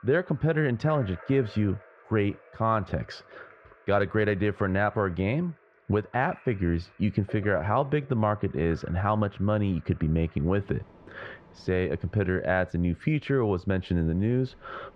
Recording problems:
muffled; very; fading above 1.5 kHz
rain or running water; faint; throughout; 25 dB below the speech

